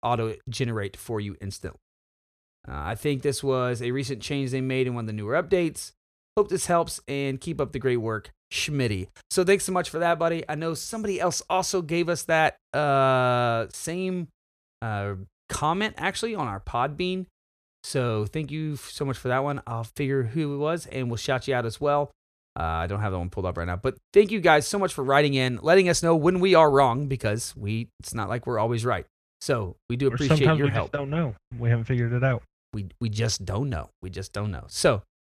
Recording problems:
none

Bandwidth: 14.5 kHz